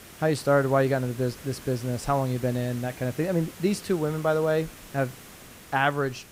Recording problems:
hiss; noticeable; throughout; 15 dB below the speech

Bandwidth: 15.5 kHz